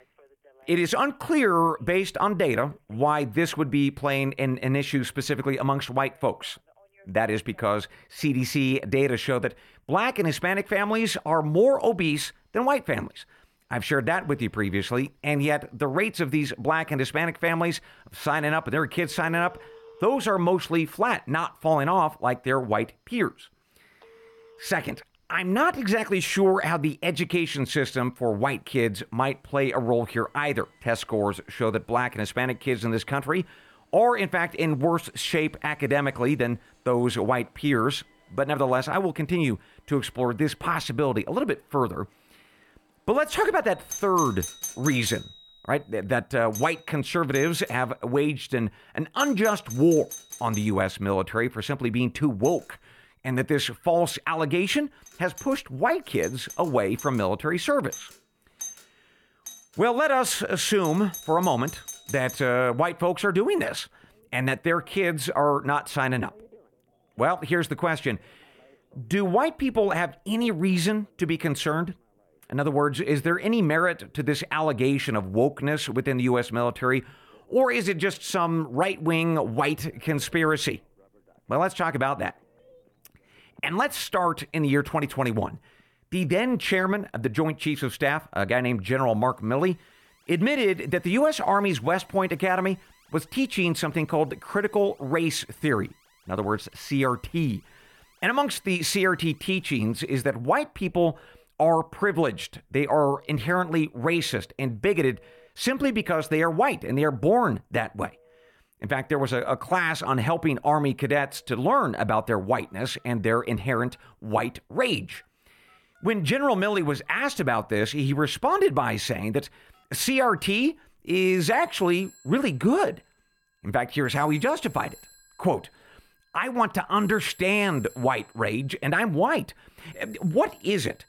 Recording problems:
alarms or sirens; noticeable; throughout; 20 dB below the speech

